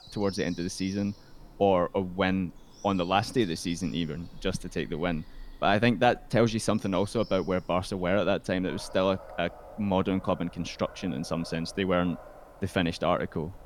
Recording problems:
animal sounds; faint; throughout; 20 dB below the speech

